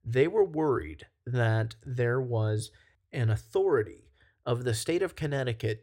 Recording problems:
none

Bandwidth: 16 kHz